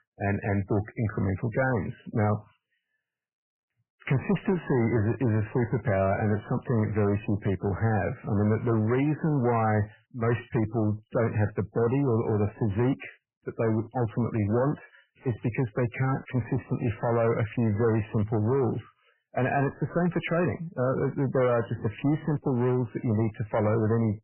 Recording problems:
garbled, watery; badly; nothing above 3 kHz
distortion; slight; 10 dB below the speech

